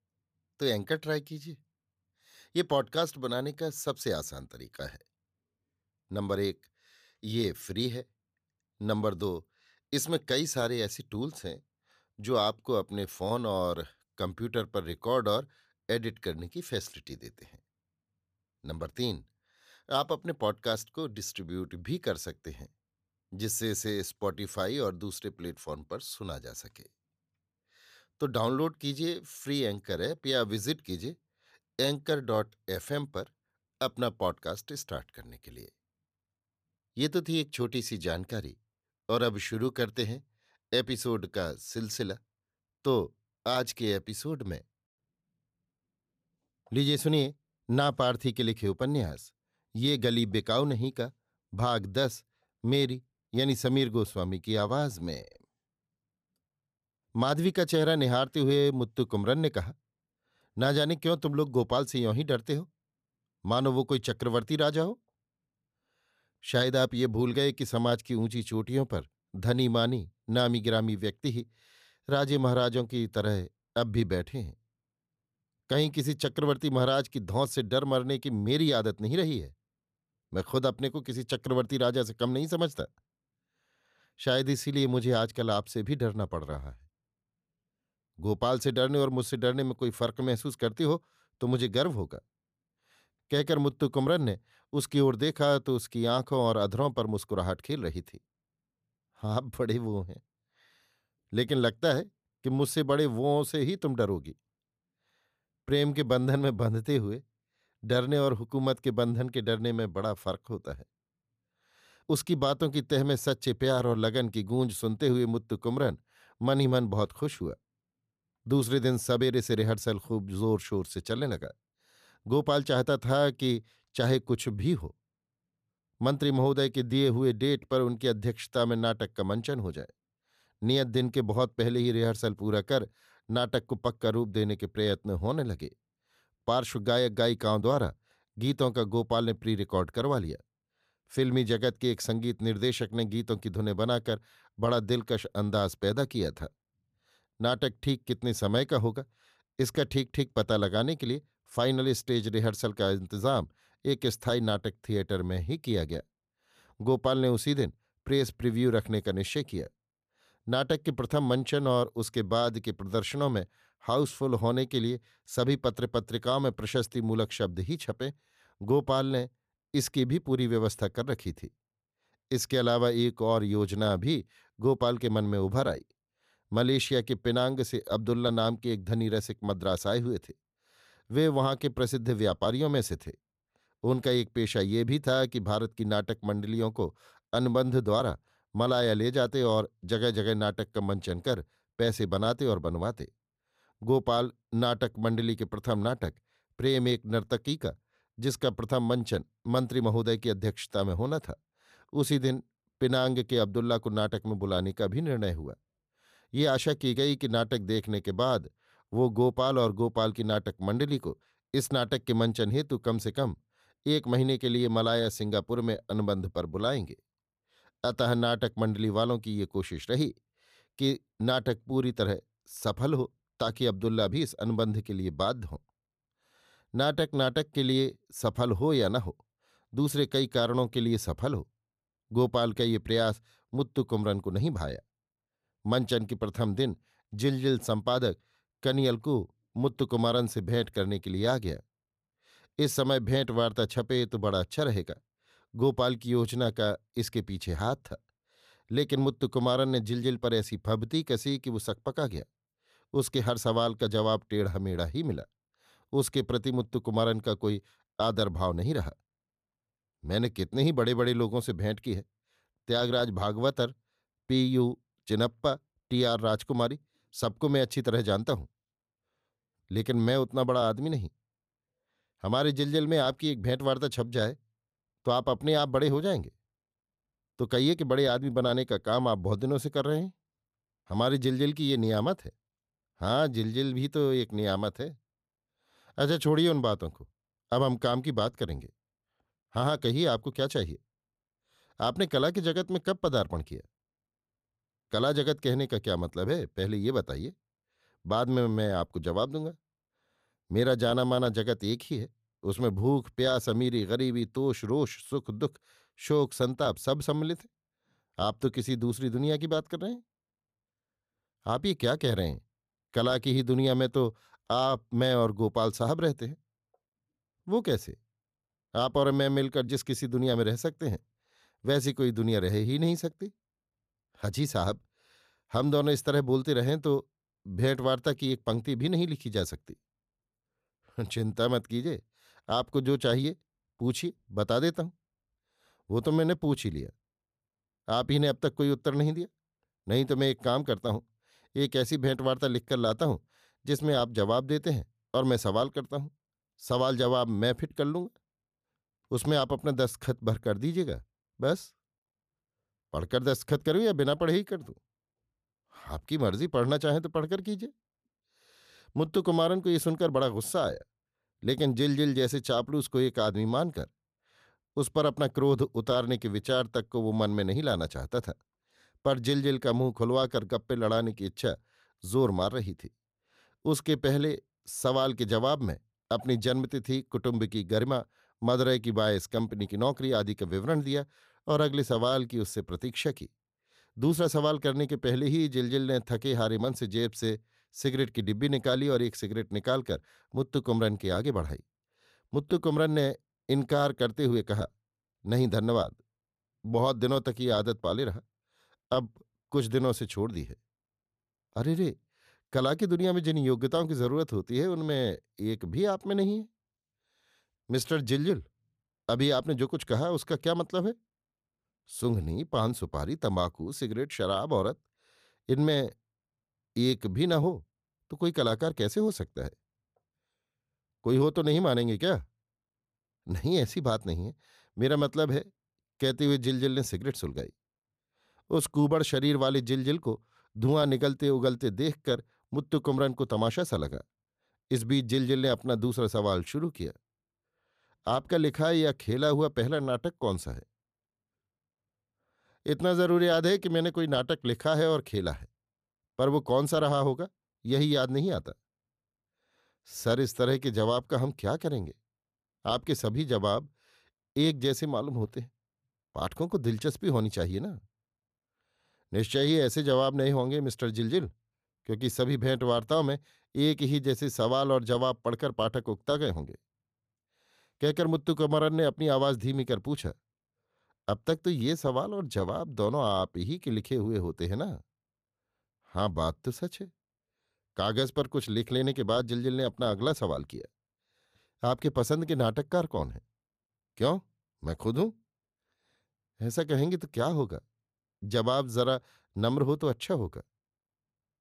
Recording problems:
none

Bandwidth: 14.5 kHz